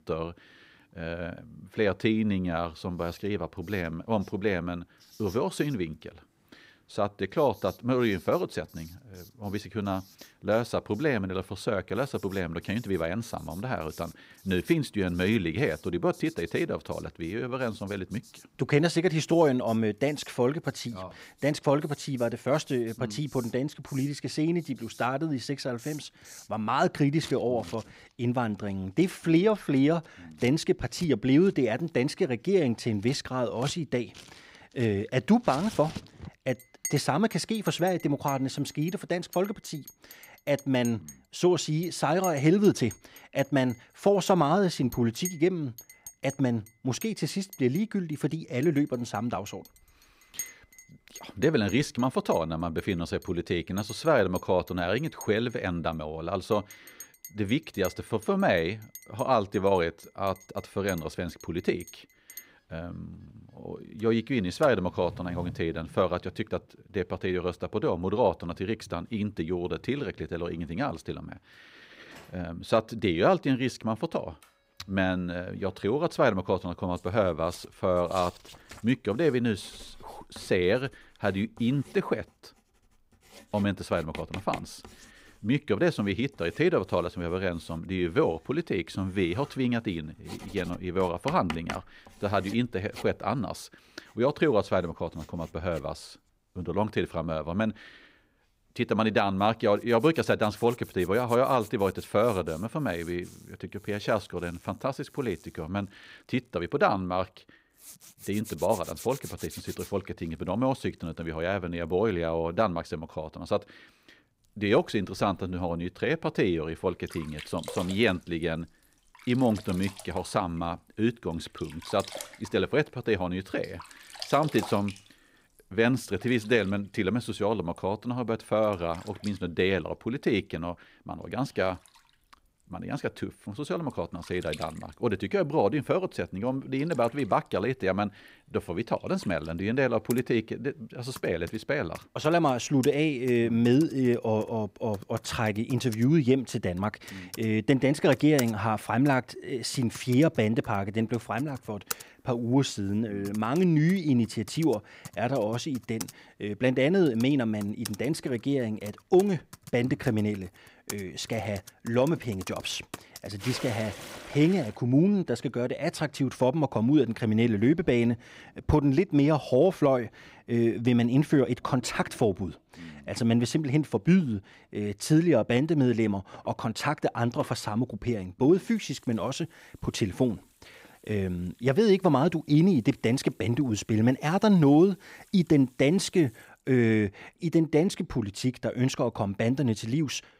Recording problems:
household noises; noticeable; throughout; 20 dB below the speech

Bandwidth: 15.5 kHz